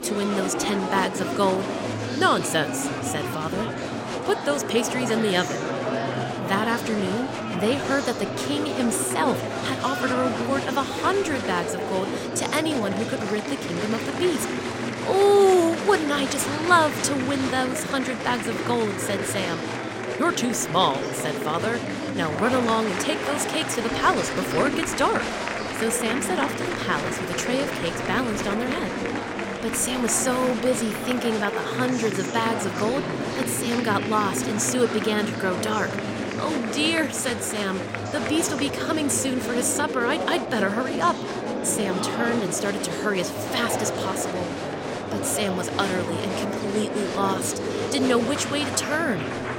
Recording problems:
murmuring crowd; loud; throughout; 3 dB below the speech

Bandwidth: 16 kHz